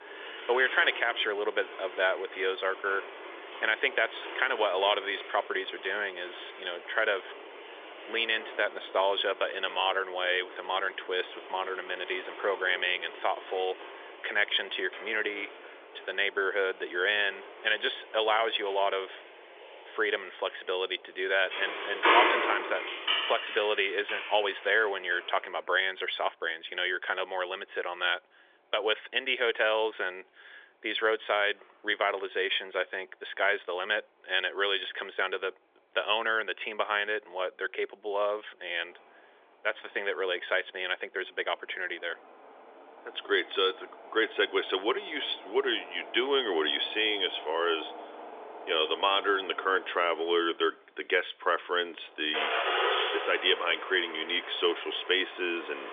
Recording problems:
phone-call audio; nothing above 3.5 kHz
traffic noise; loud; throughout; 7 dB below the speech

